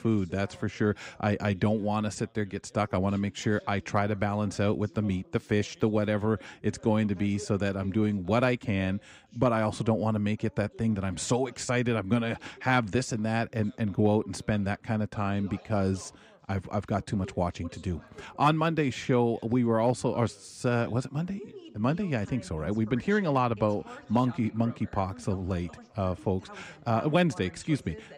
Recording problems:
background chatter; faint; throughout; 2 voices, 25 dB below the speech

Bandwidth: 15.5 kHz